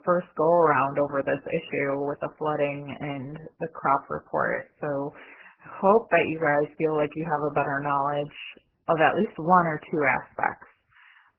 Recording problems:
garbled, watery; badly; nothing above 3 kHz

